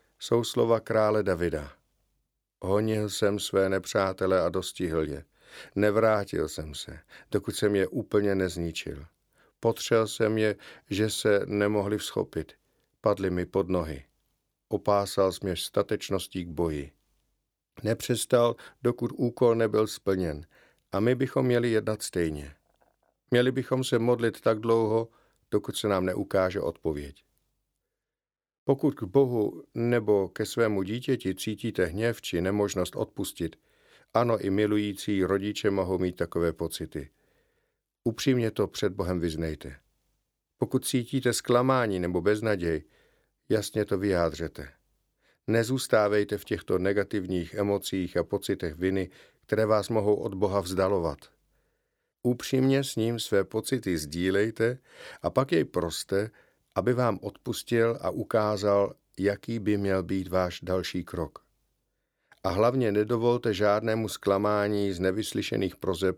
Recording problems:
none

